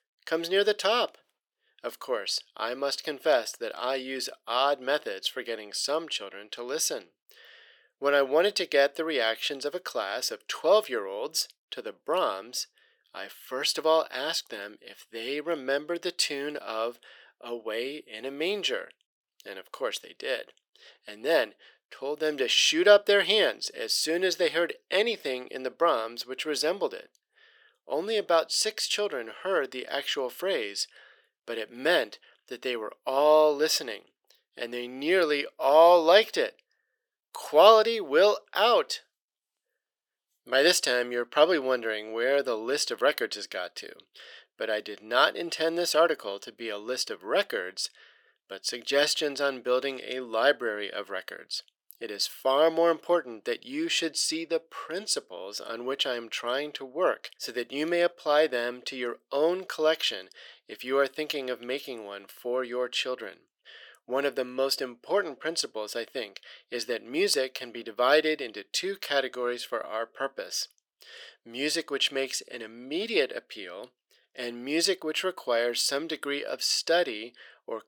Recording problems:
thin; very; fading below 450 Hz

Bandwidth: 18 kHz